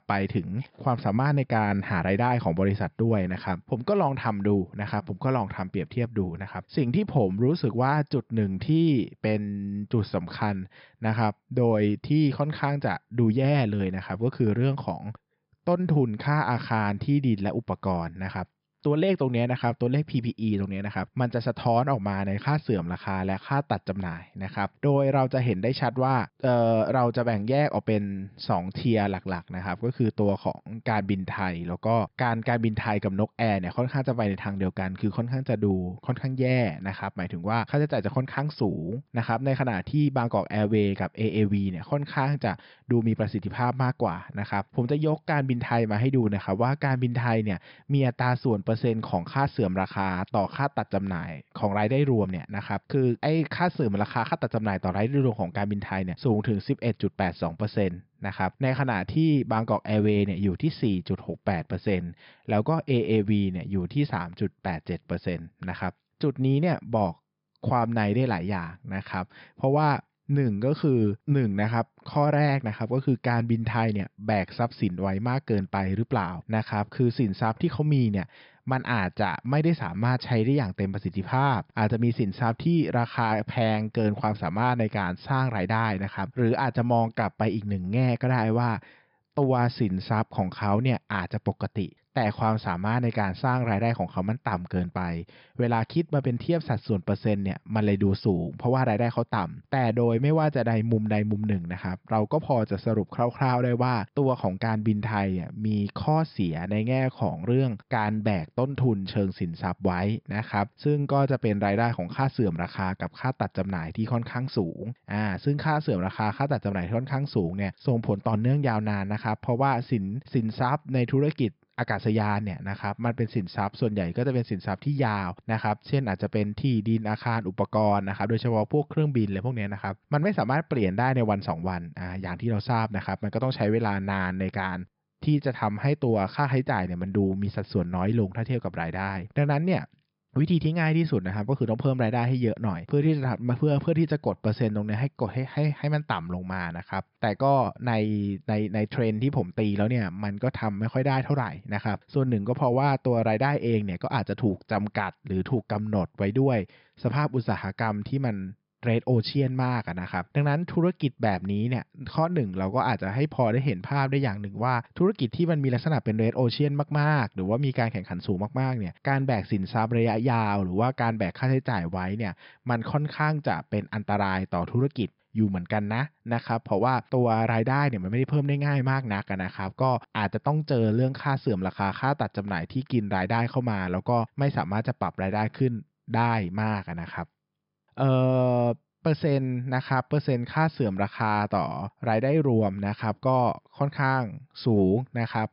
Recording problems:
high frequencies cut off; noticeable; nothing above 5.5 kHz

